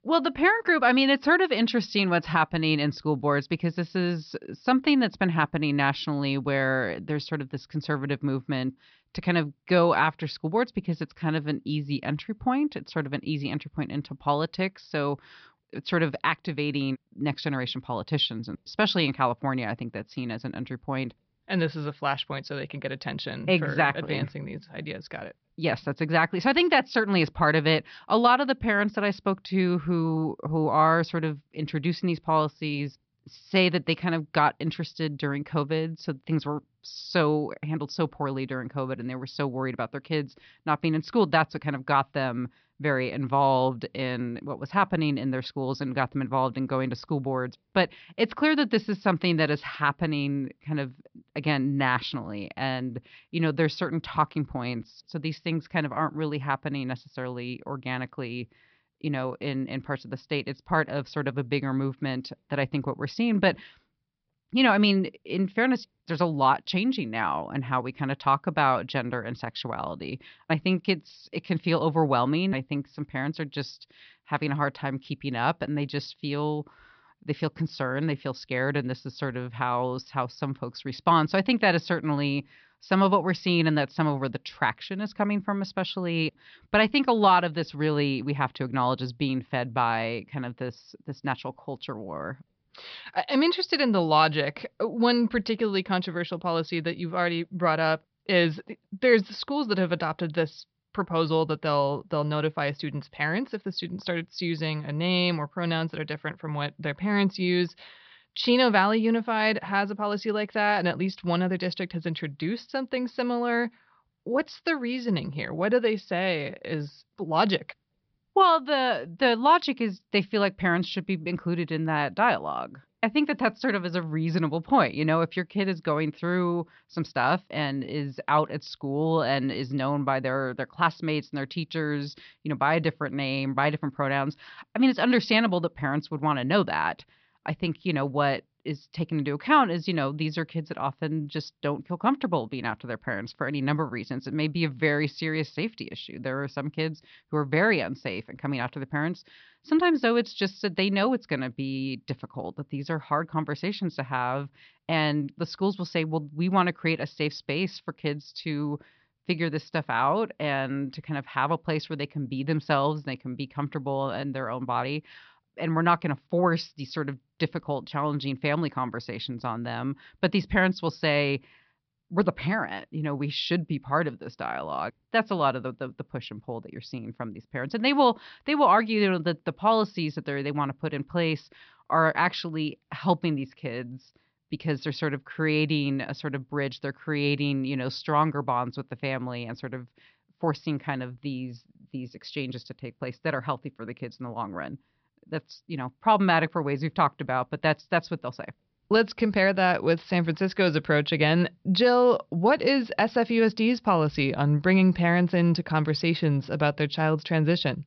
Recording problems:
high frequencies cut off; noticeable; nothing above 5.5 kHz

